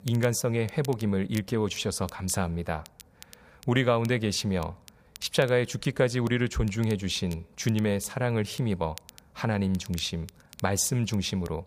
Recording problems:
crackle, like an old record; faint; 20 dB below the speech

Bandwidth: 15 kHz